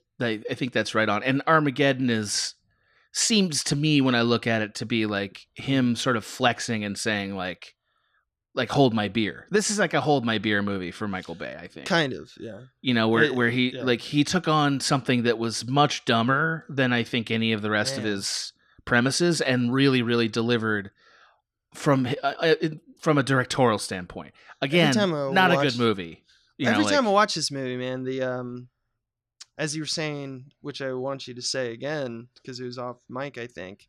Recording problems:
none

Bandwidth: 14.5 kHz